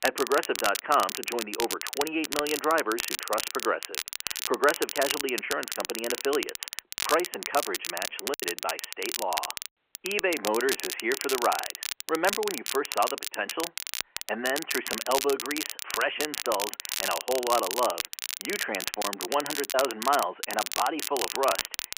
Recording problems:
phone-call audio
crackle, like an old record; loud; 3 dB below the speech
choppy; occasionally; at 8 s and at 19 s; 4% of the speech affected

